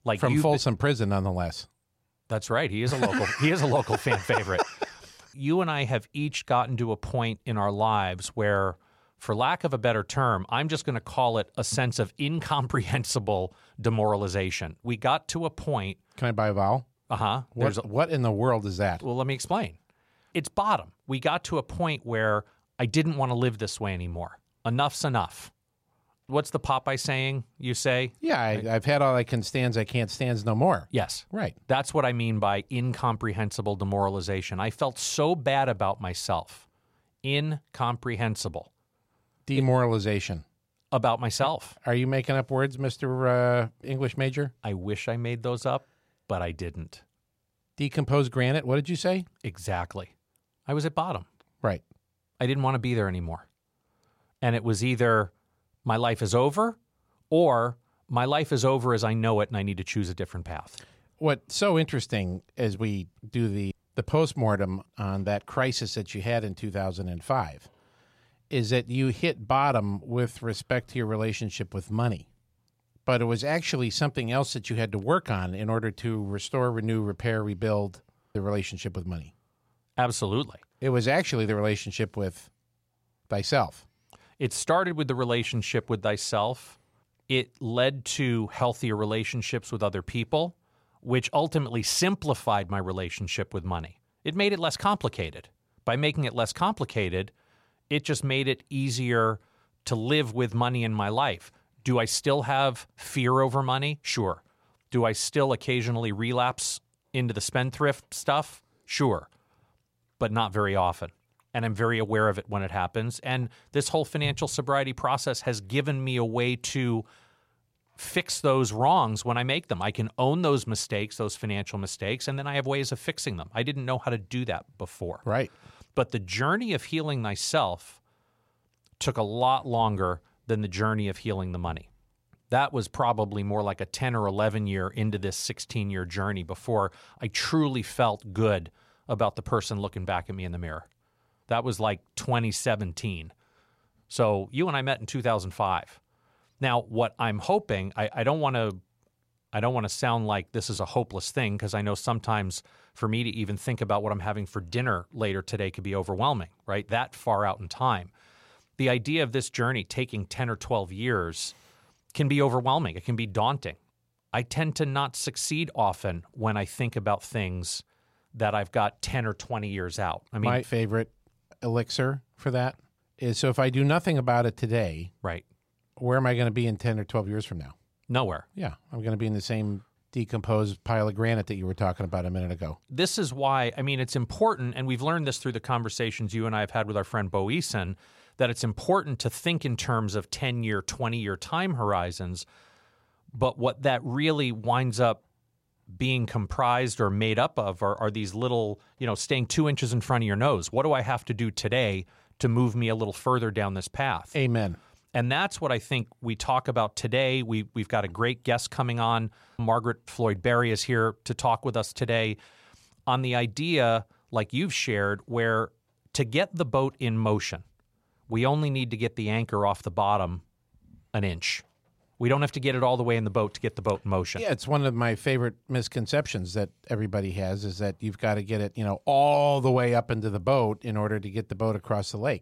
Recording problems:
none

